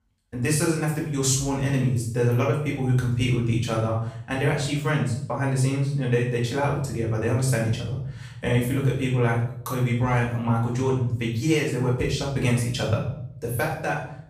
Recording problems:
off-mic speech; far
room echo; noticeable; dies away in 0.7 s

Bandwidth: 15 kHz